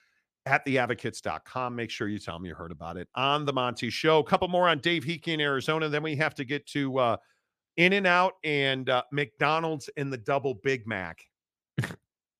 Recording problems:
none

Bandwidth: 15 kHz